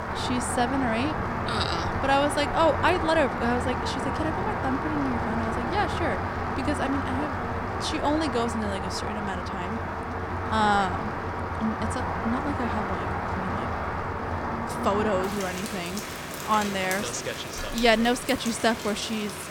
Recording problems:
rain or running water; loud; throughout; 2 dB below the speech

